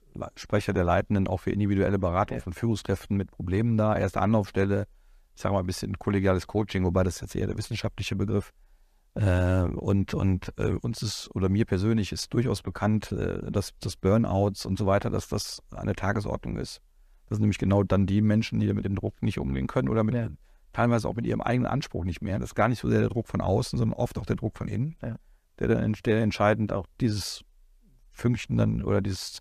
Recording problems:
none

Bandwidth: 14.5 kHz